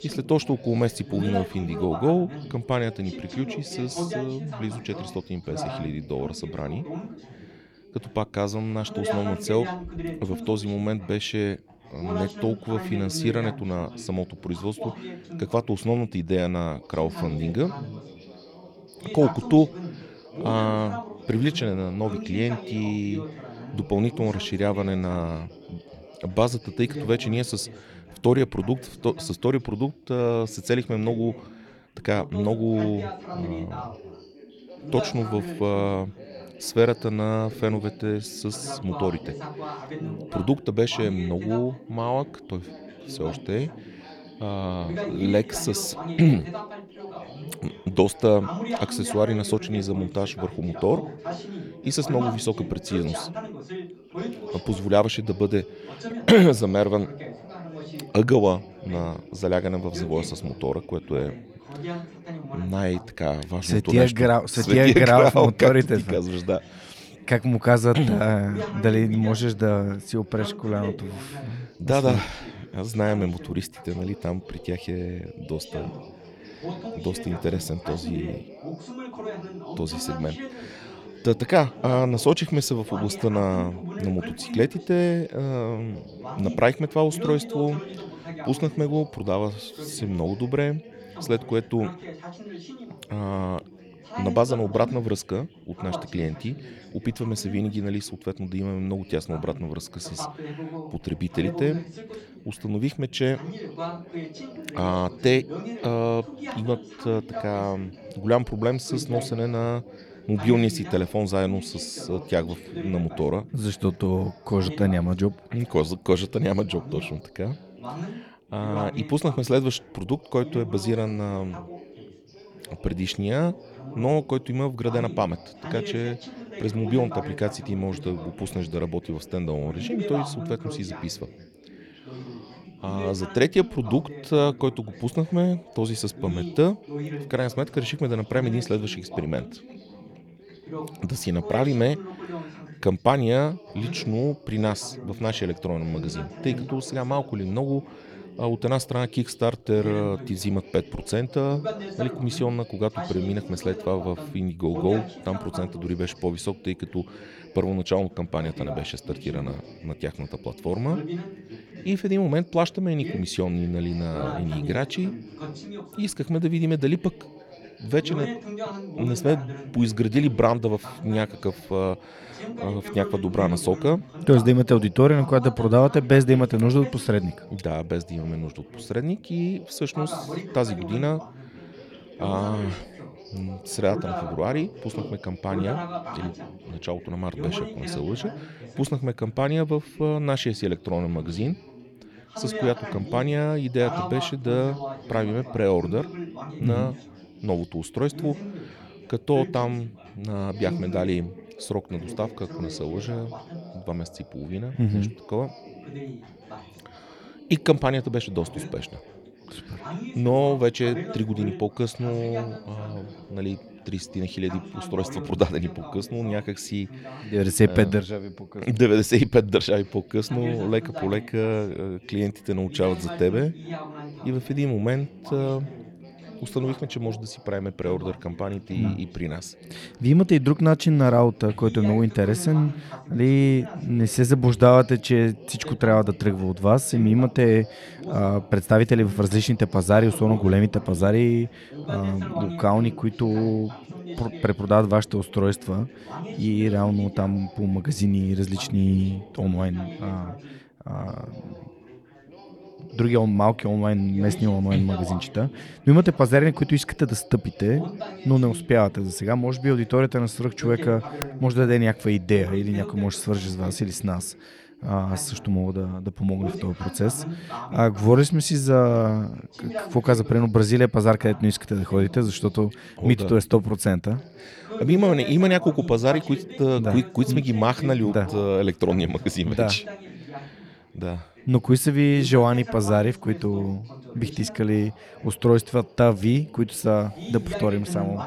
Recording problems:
background chatter; noticeable; throughout; 3 voices, 15 dB below the speech

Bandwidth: 18 kHz